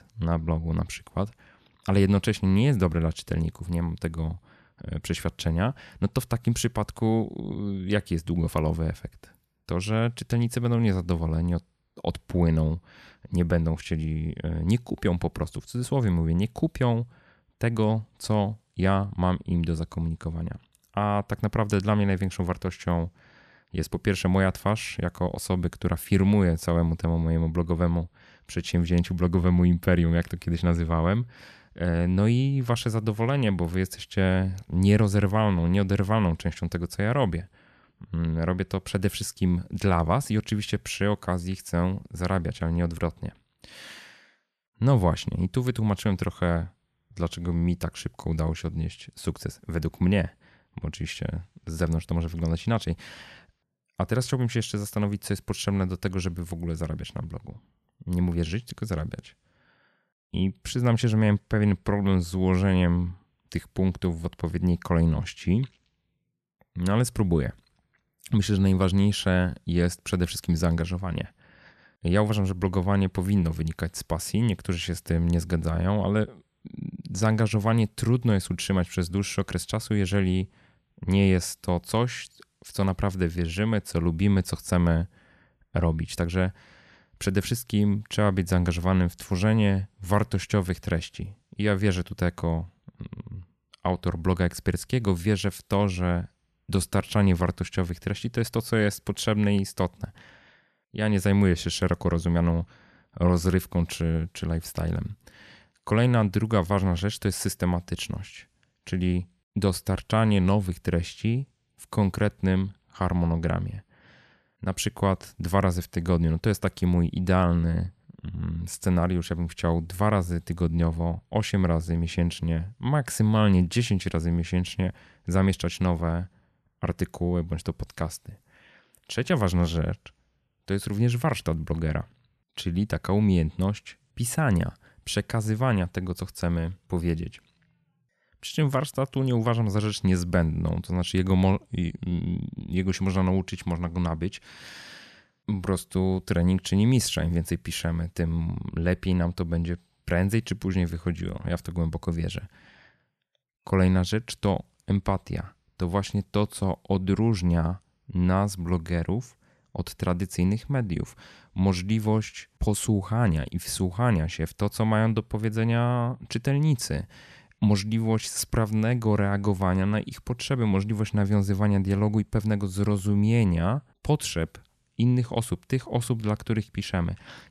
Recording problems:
none

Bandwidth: 13.5 kHz